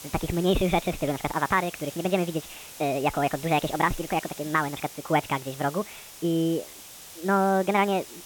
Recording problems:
high frequencies cut off; severe; nothing above 4 kHz
wrong speed and pitch; too fast and too high; 1.5 times normal speed
hiss; noticeable; throughout; 15 dB below the speech

